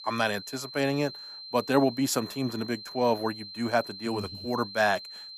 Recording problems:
high-pitched whine; noticeable; throughout; 4 kHz, 10 dB below the speech

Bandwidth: 14.5 kHz